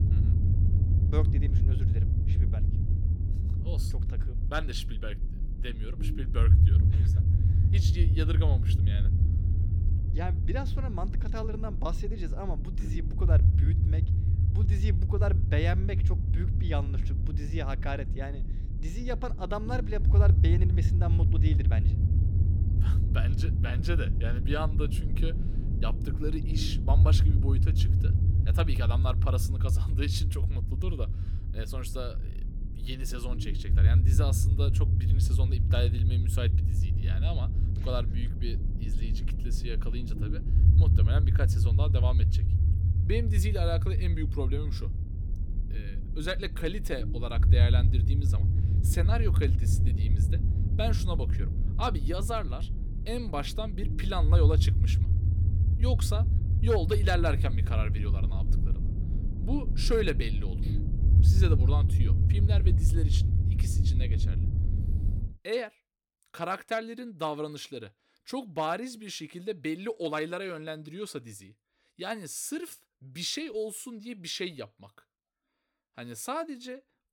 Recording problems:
low rumble; loud; until 1:05; 6 dB below the speech

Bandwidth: 17 kHz